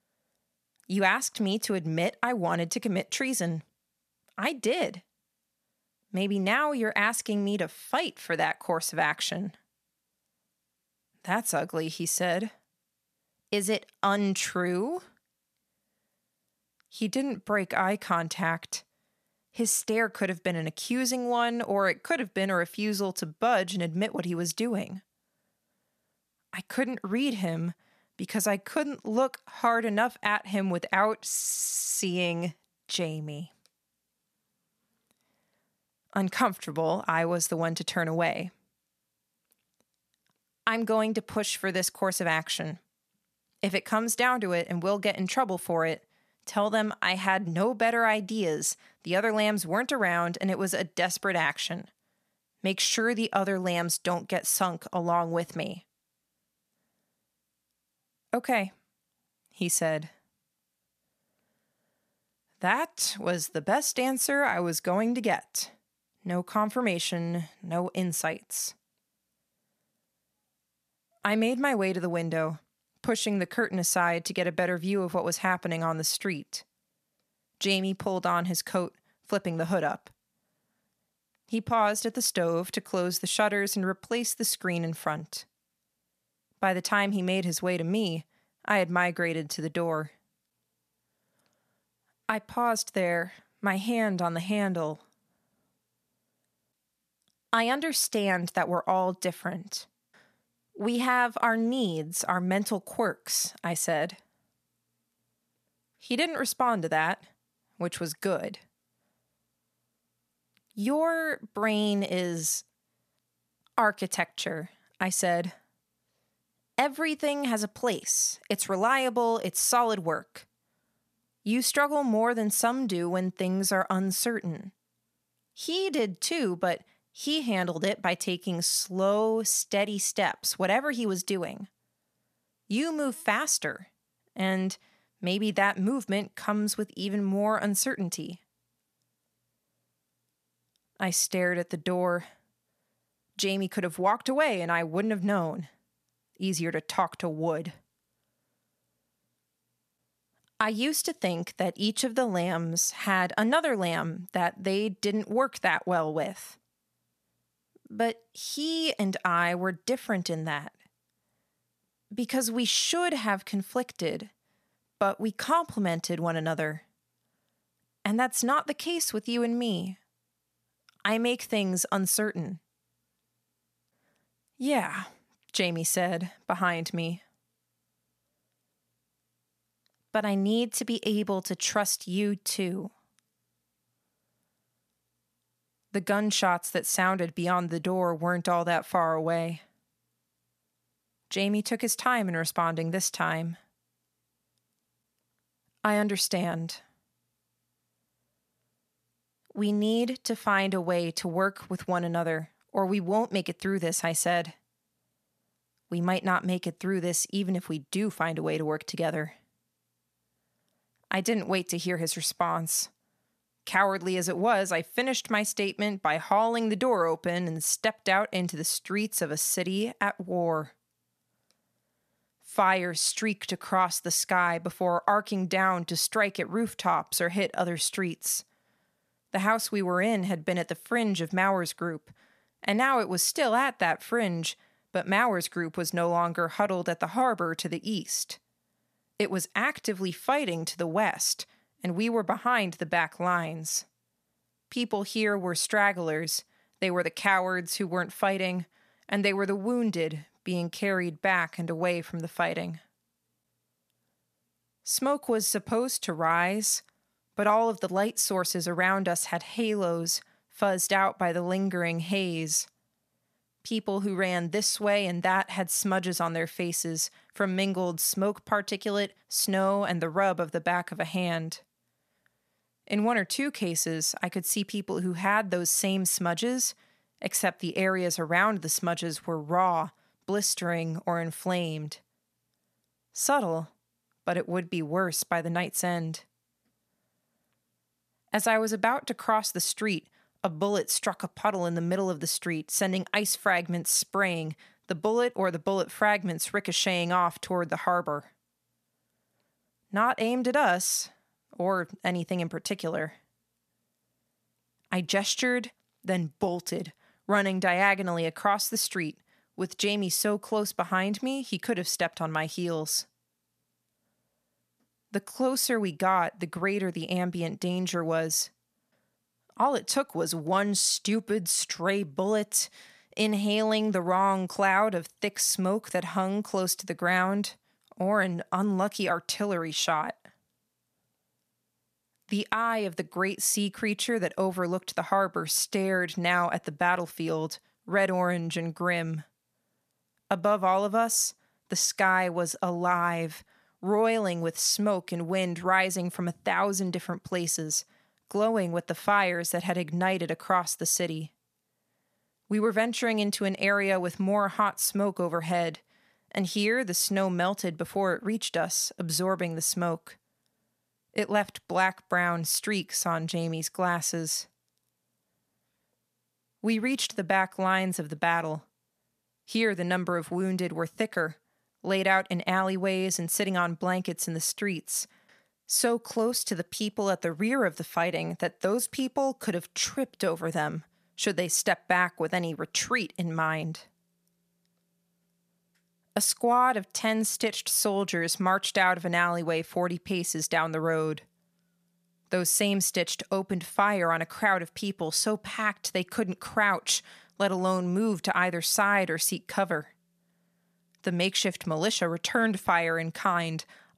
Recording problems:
audio stuttering; at 31 s

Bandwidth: 14.5 kHz